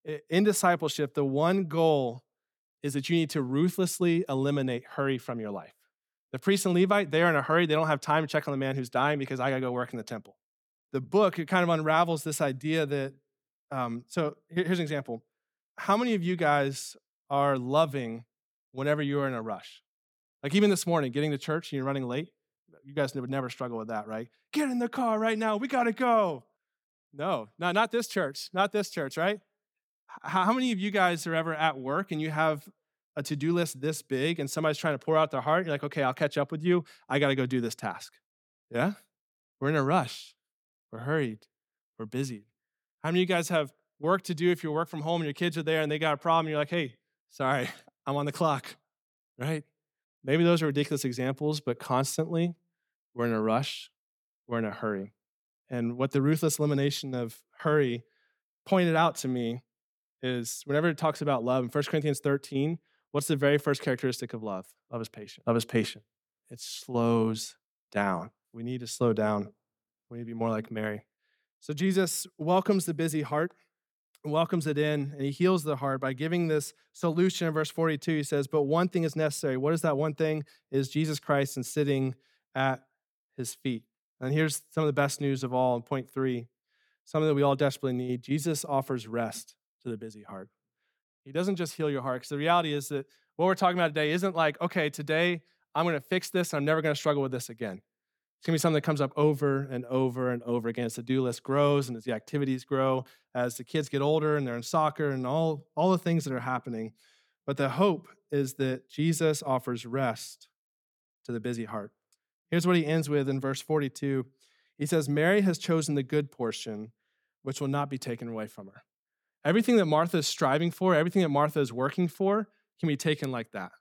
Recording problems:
none

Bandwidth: 17.5 kHz